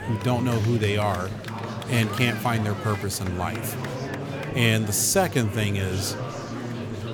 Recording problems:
murmuring crowd; loud; throughout; 8 dB below the speech

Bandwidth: 18 kHz